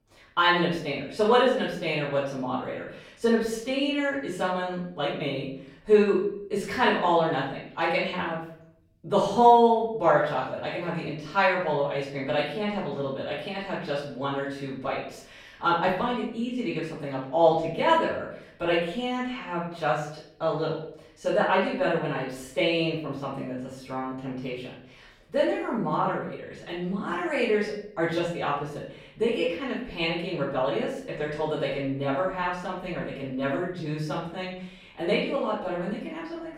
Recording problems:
off-mic speech; far
room echo; noticeable; dies away in 0.6 s

